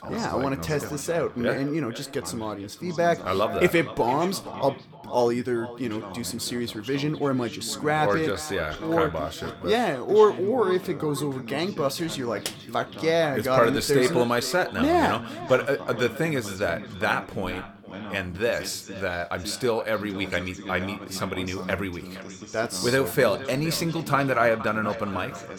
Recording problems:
echo of what is said; noticeable; throughout; 470 ms later, 15 dB below the speech
voice in the background; noticeable; throughout; 15 dB below the speech

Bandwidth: 18.5 kHz